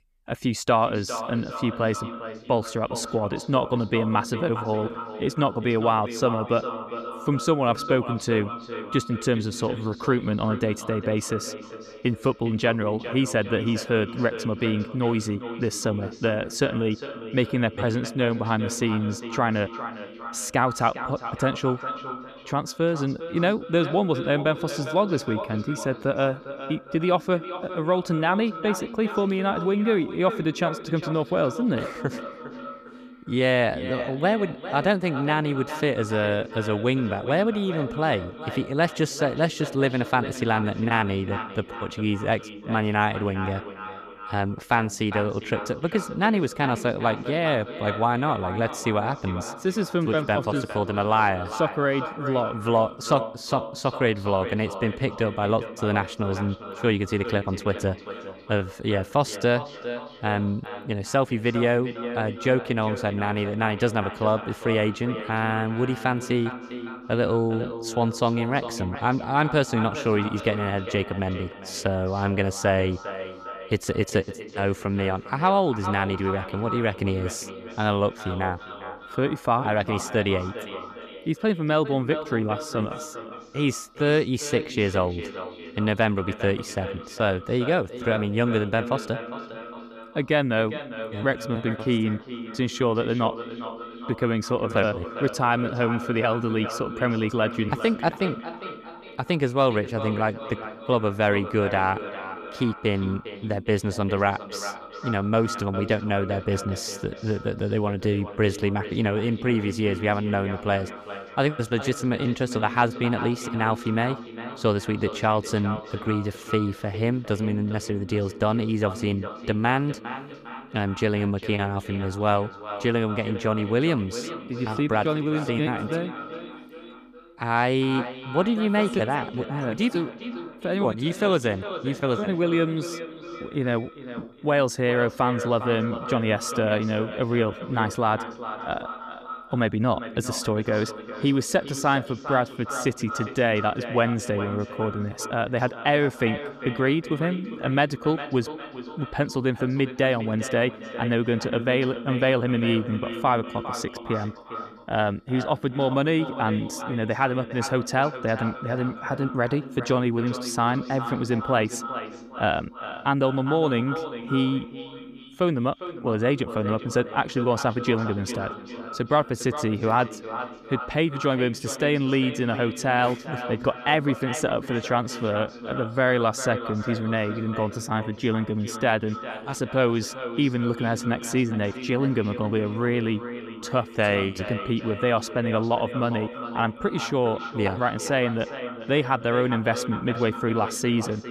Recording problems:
echo of what is said; strong; throughout; 400 ms later, 10 dB below the speech

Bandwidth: 14.5 kHz